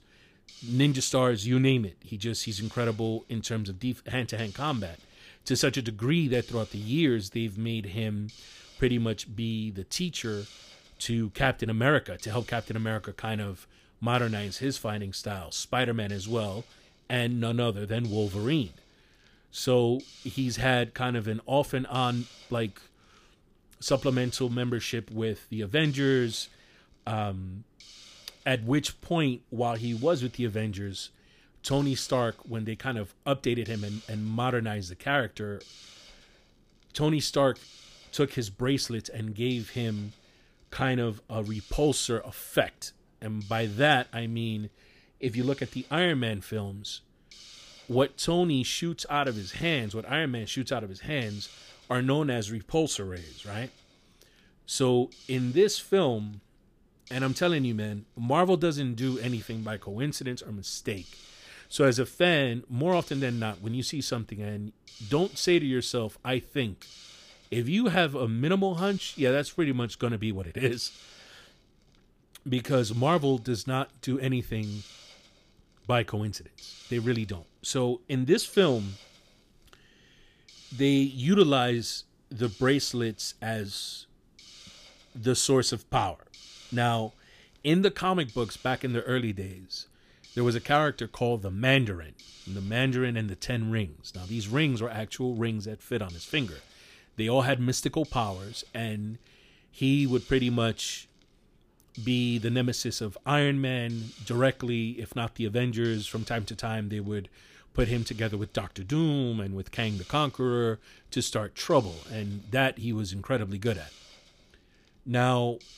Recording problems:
hiss; faint; throughout; 20 dB below the speech

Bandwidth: 15 kHz